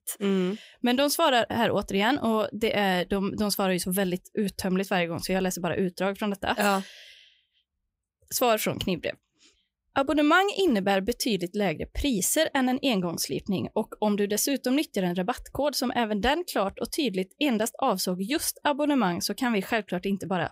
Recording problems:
none

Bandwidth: 15.5 kHz